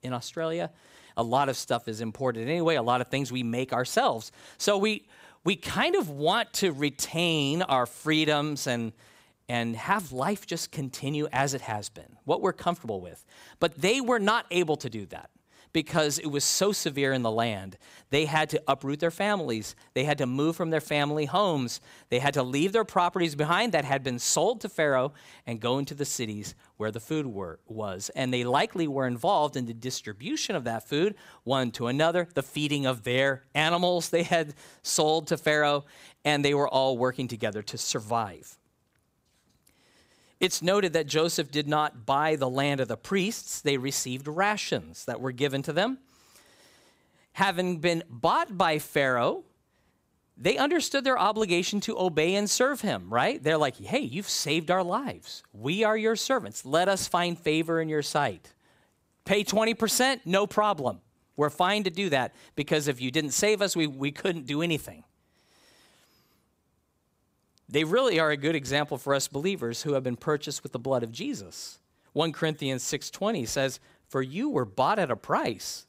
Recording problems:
none

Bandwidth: 15.5 kHz